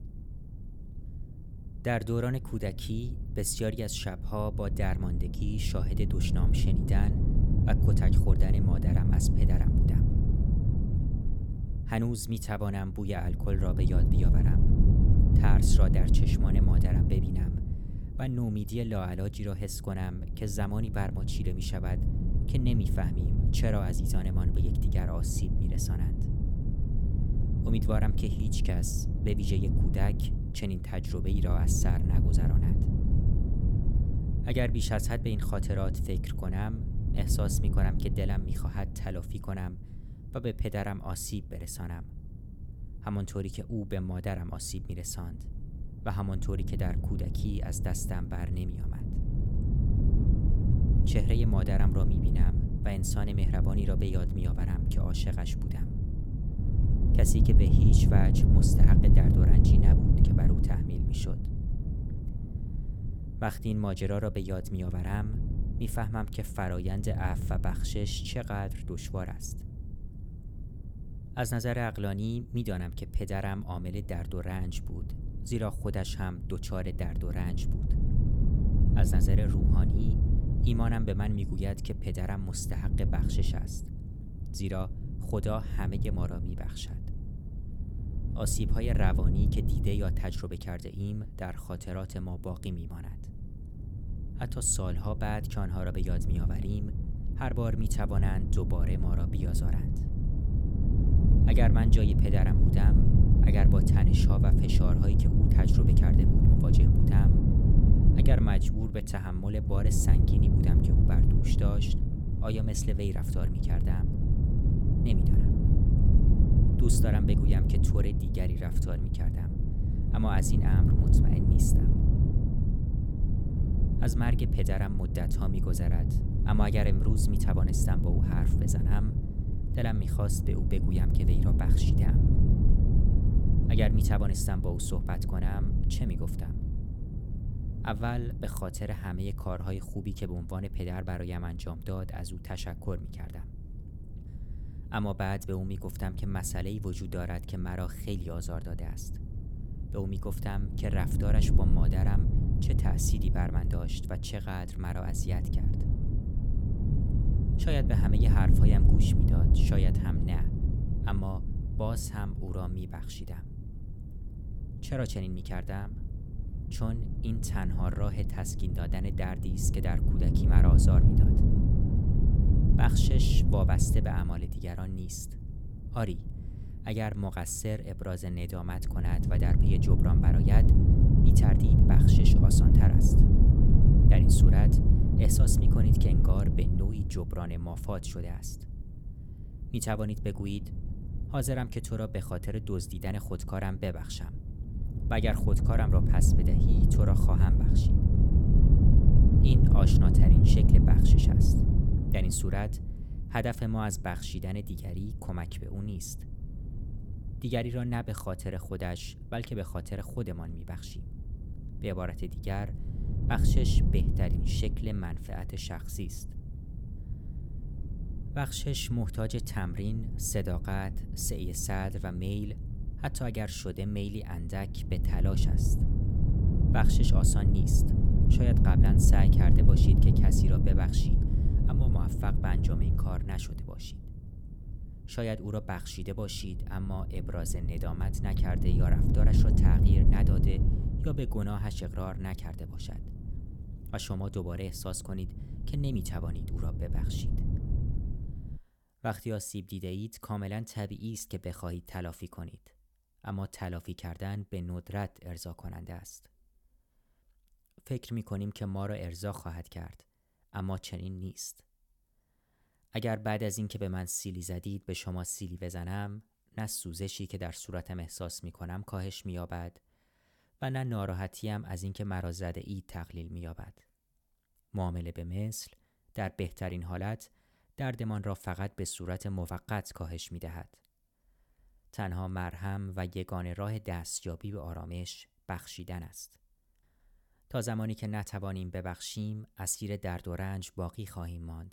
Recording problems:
wind noise on the microphone; heavy; until 4:09; 1 dB below the speech

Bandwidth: 17.5 kHz